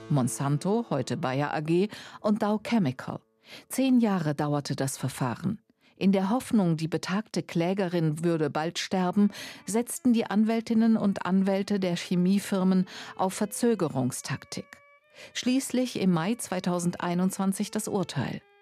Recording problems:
background music; faint; throughout; 30 dB below the speech

